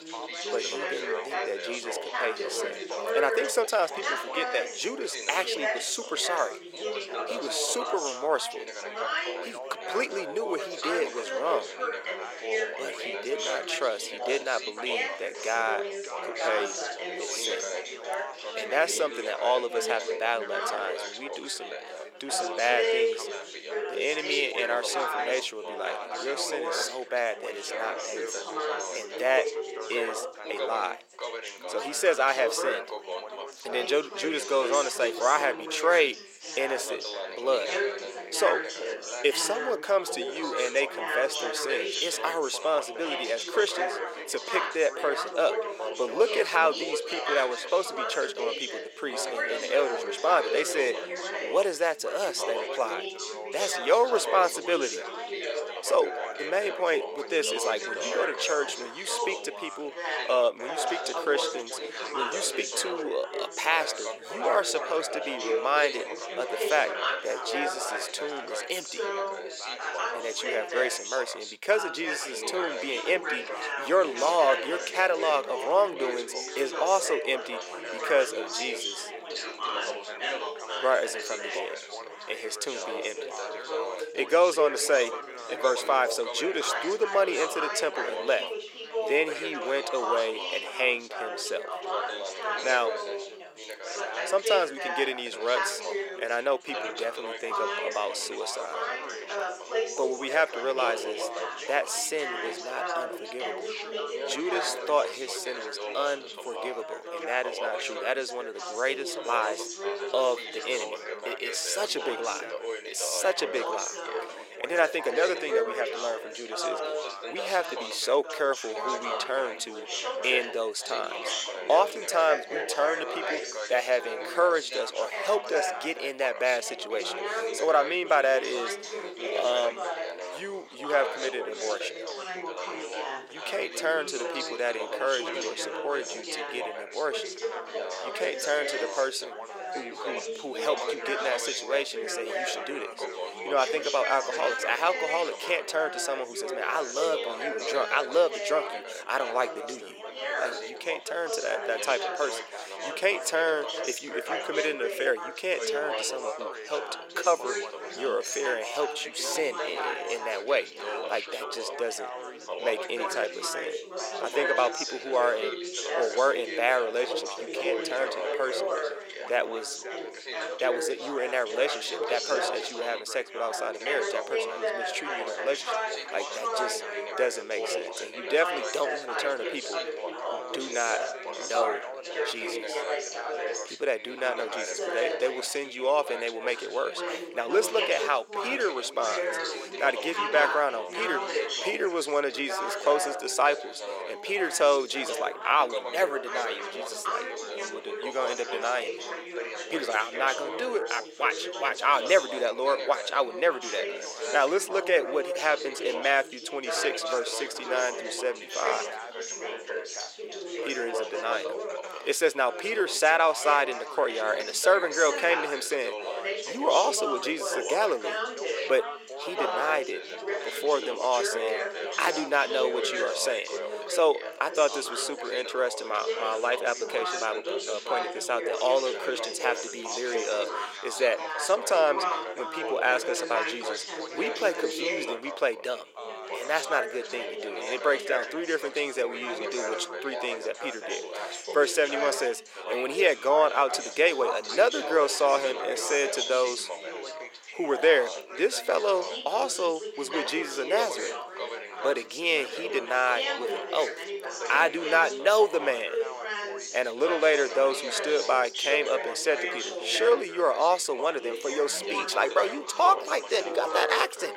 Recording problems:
thin; very; fading below 450 Hz
background chatter; loud; throughout; 4 voices, 5 dB below the speech

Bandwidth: 16 kHz